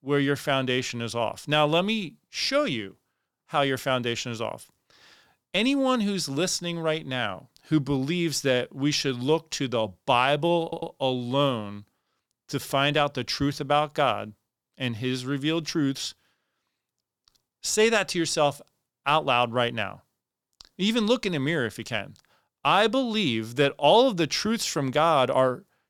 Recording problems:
audio stuttering; at 11 s

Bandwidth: 19 kHz